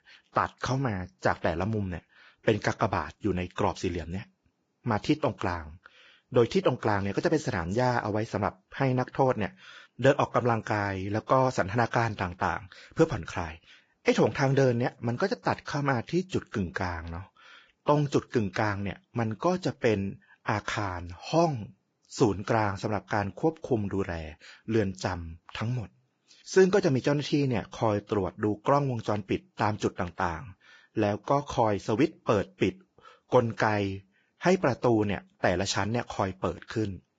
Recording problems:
garbled, watery; badly; nothing above 7.5 kHz

